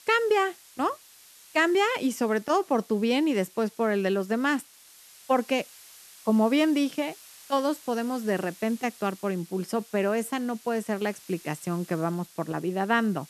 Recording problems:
hiss; faint; throughout; 20 dB below the speech

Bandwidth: 13.5 kHz